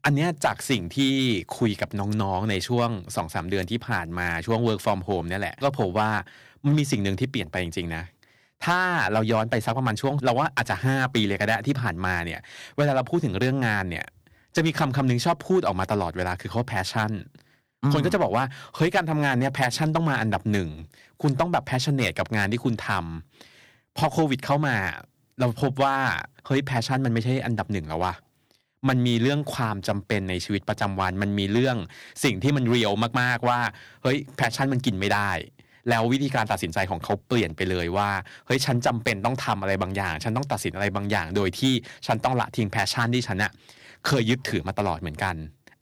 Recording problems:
distortion; slight; 2% of the sound clipped

